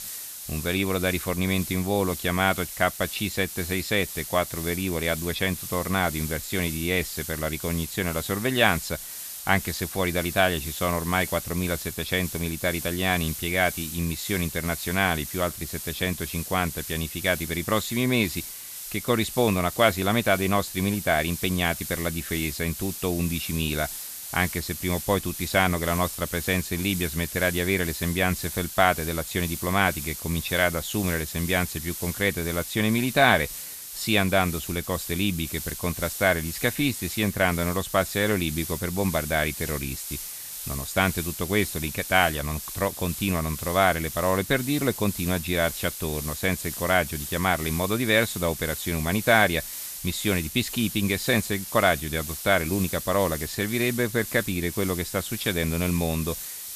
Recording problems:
hiss; loud; throughout; 8 dB below the speech

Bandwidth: 14.5 kHz